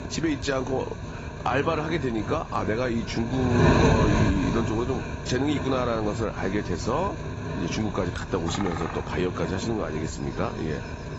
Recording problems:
garbled, watery; badly; nothing above 7.5 kHz
wind noise on the microphone; heavy; 3 dB below the speech
animal sounds; noticeable; throughout; 15 dB below the speech

